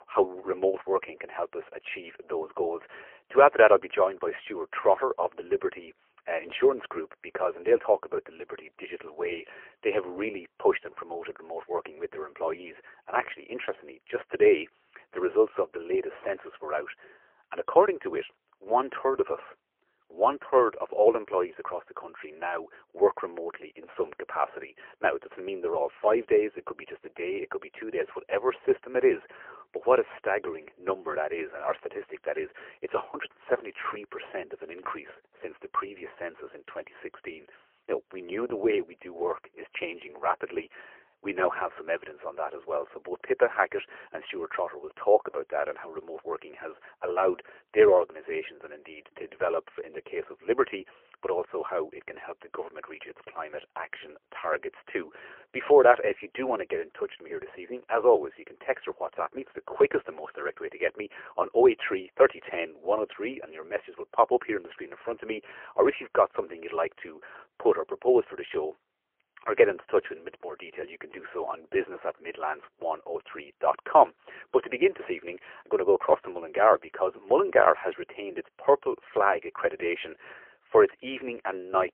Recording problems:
phone-call audio; poor line; nothing above 3 kHz

